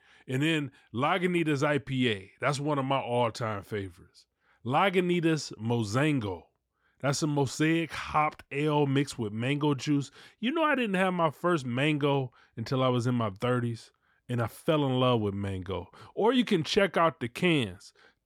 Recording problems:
none

